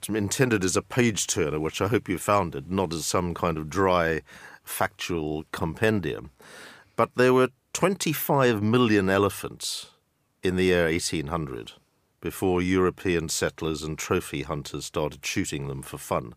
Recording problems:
none

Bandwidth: 15 kHz